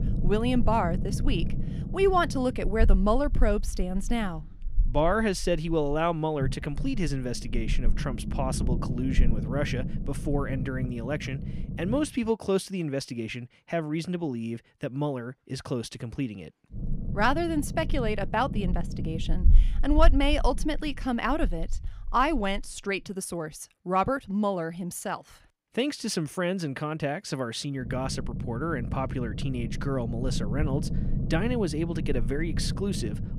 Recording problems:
low rumble; noticeable; until 12 s, from 17 to 23 s and from 28 s on; 15 dB below the speech

